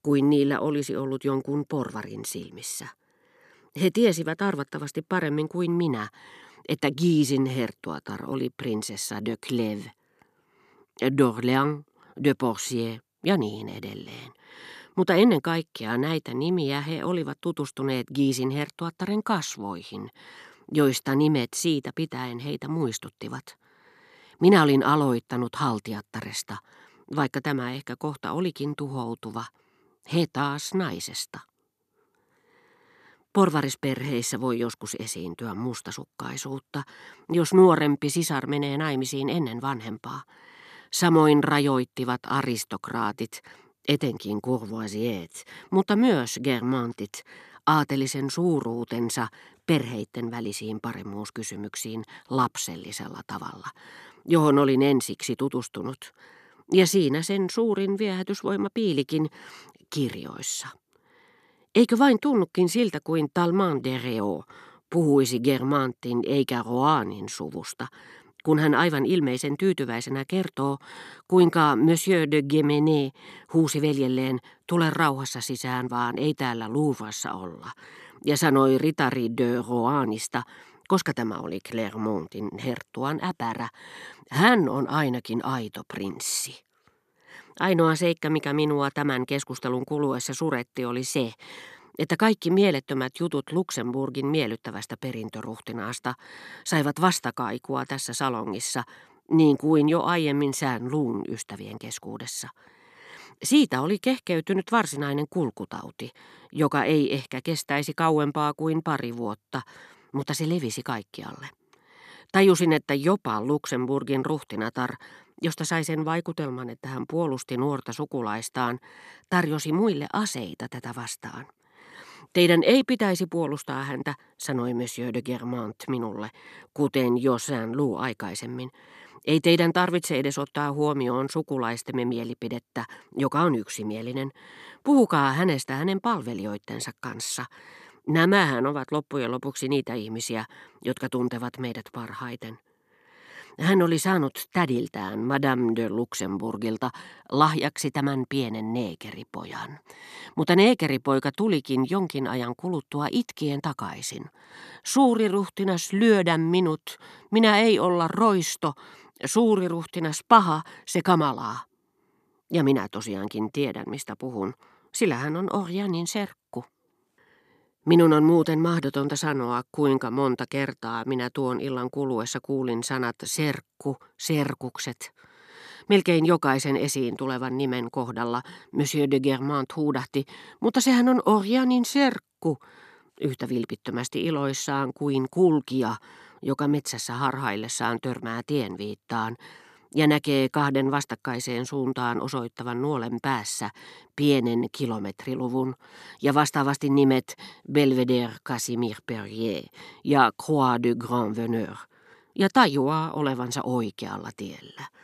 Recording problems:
none

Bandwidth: 13.5 kHz